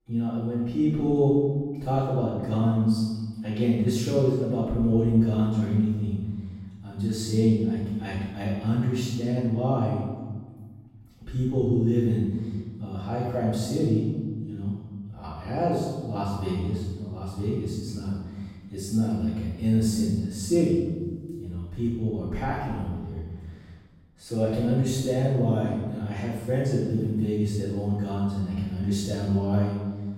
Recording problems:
room echo; strong; dies away in 1.4 s
off-mic speech; far

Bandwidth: 16 kHz